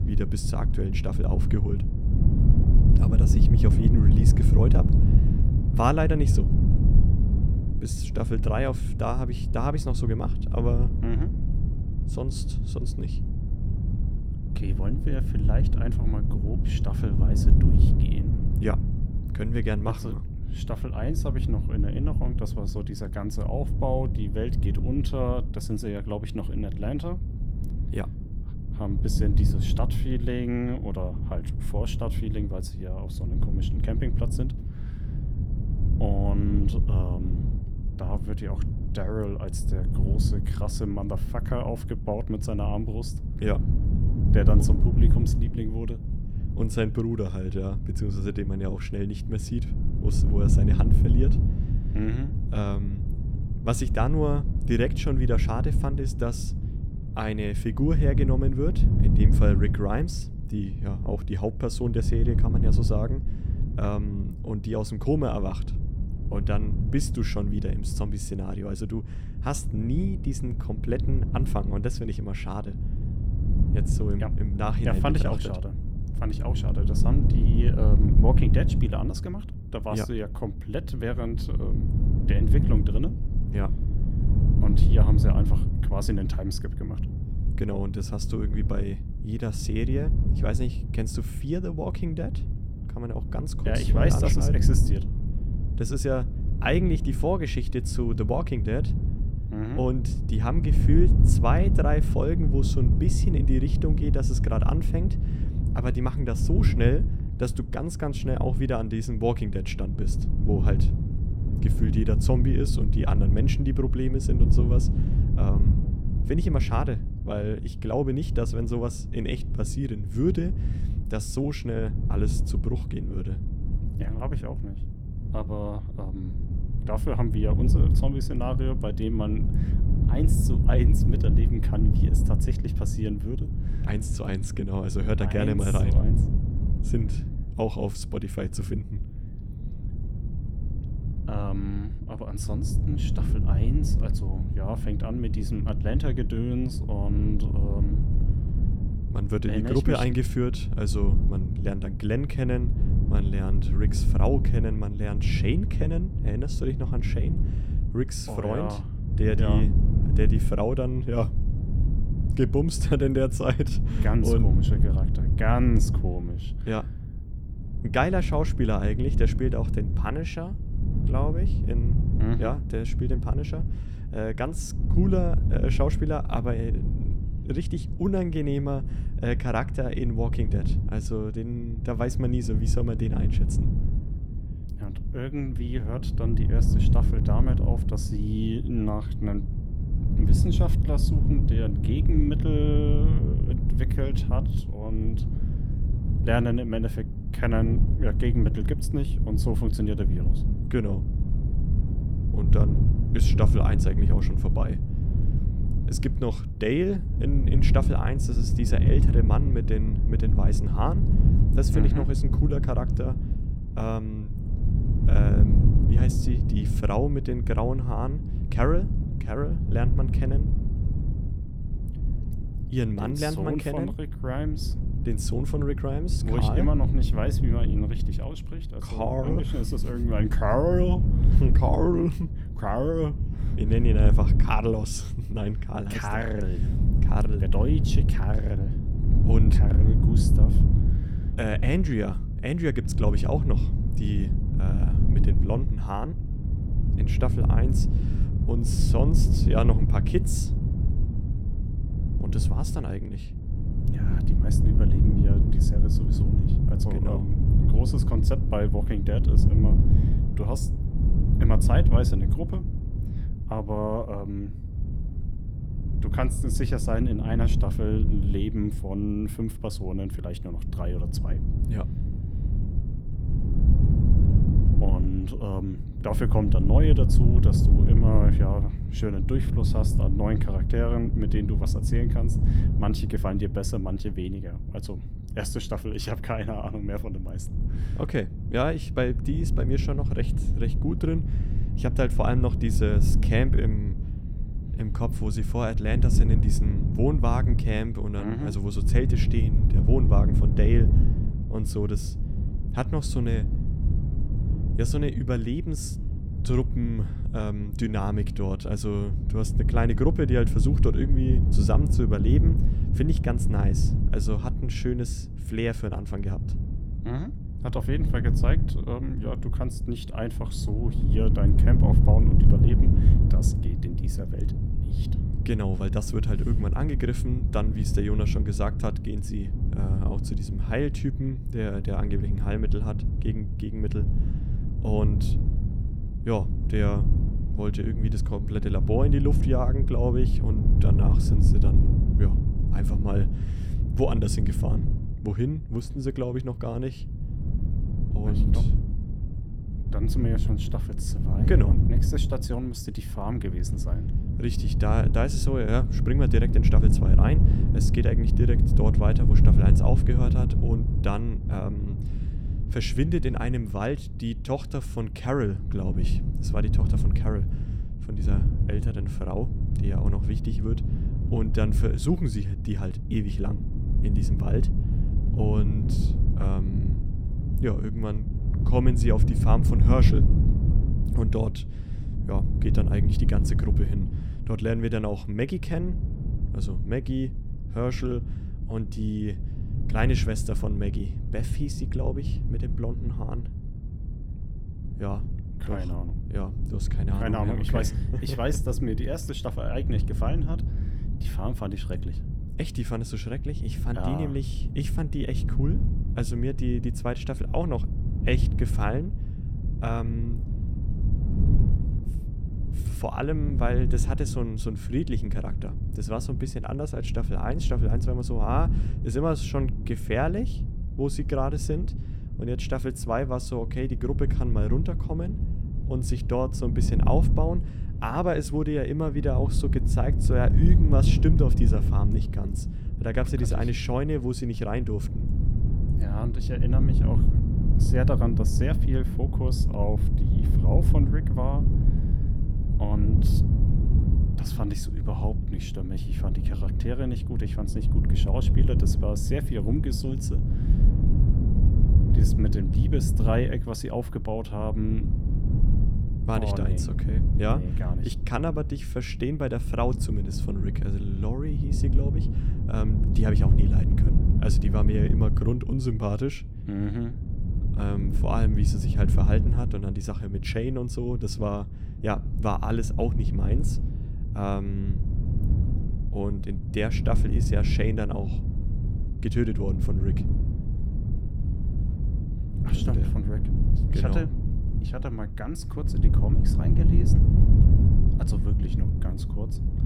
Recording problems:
wind noise on the microphone; heavy; 6 dB below the speech

